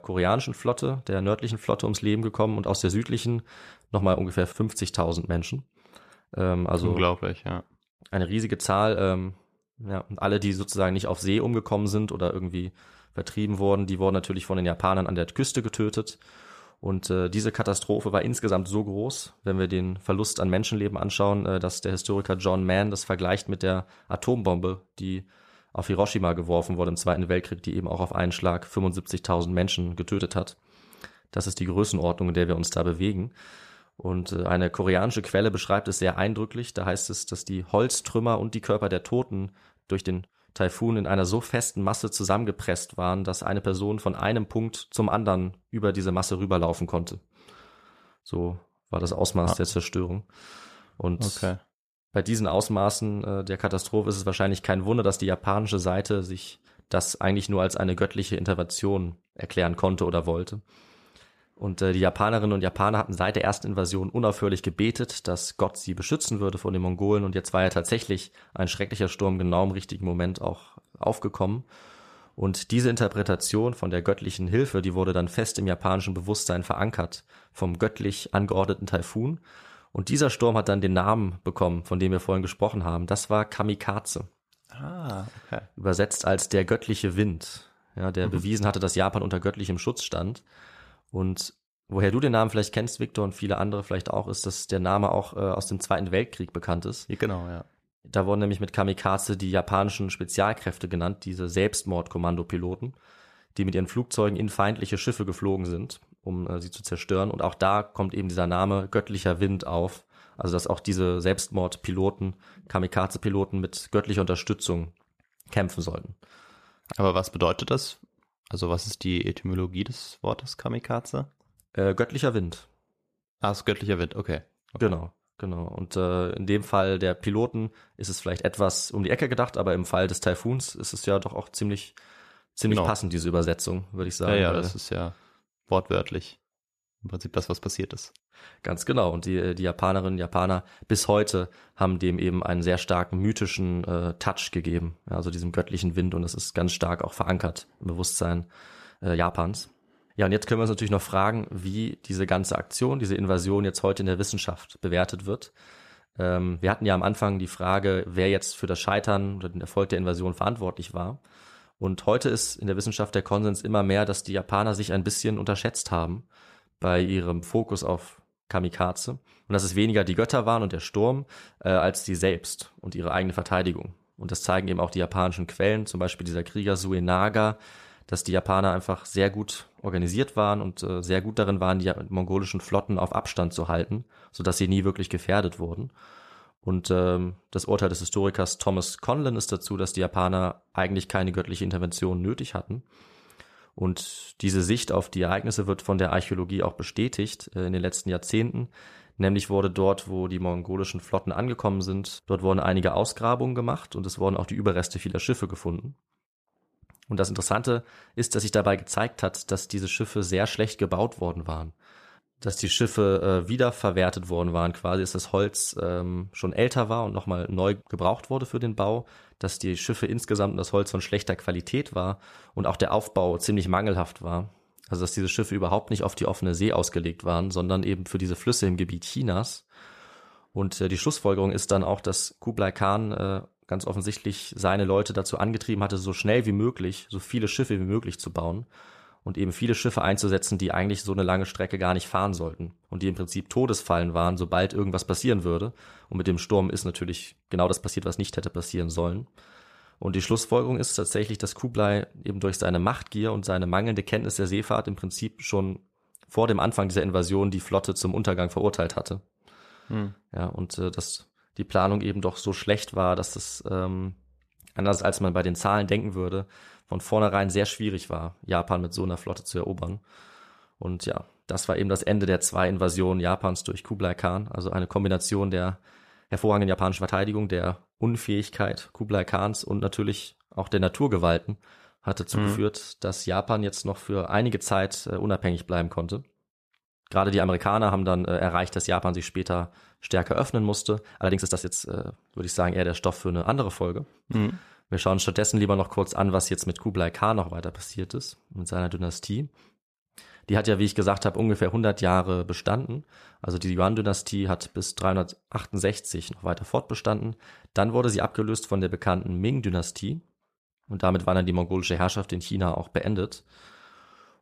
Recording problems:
uneven, jittery; strongly; from 34 s to 5:10

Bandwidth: 14.5 kHz